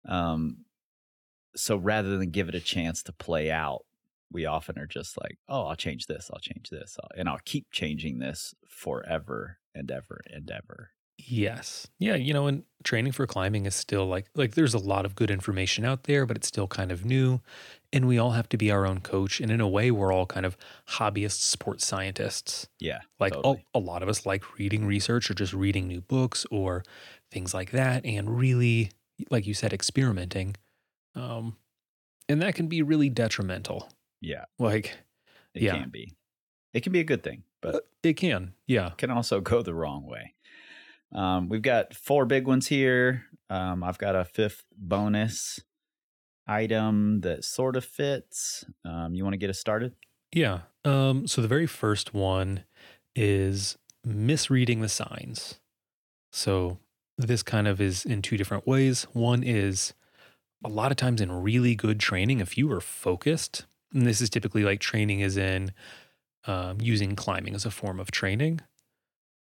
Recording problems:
none

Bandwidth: 18 kHz